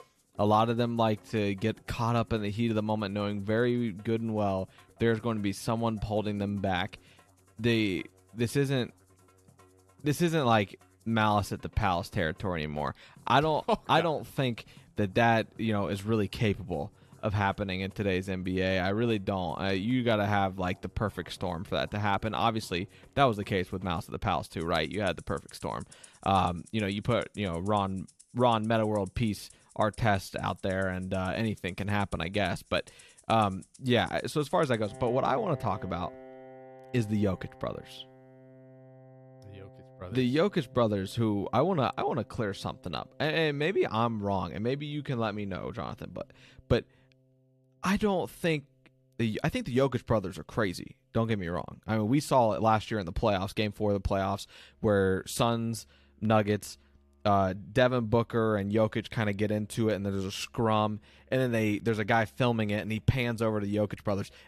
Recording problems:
background music; faint; throughout; 25 dB below the speech

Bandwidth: 13.5 kHz